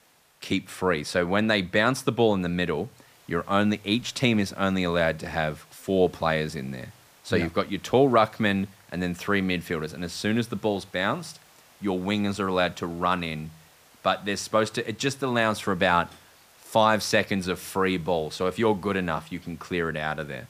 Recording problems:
hiss; faint; throughout; 30 dB below the speech

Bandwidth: 15 kHz